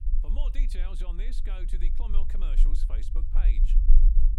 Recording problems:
low rumble; loud; throughout; 6 dB below the speech

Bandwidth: 16 kHz